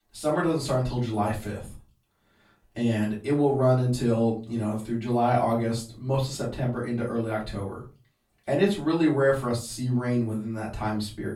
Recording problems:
off-mic speech; far
room echo; slight; dies away in 0.3 s

